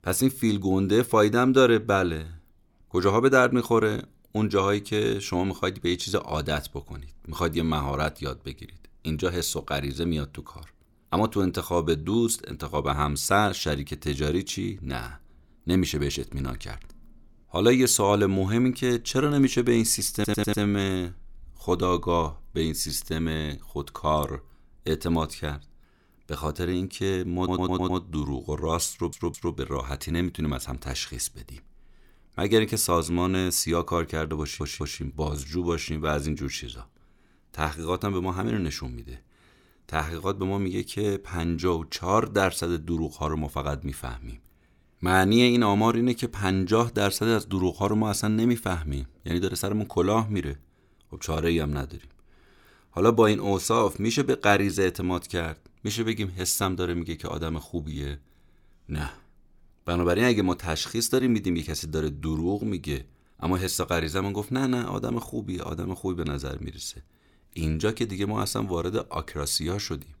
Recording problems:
audio stuttering; 4 times, first at 20 s

